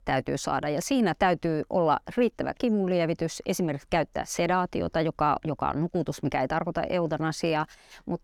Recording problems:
none

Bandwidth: 18 kHz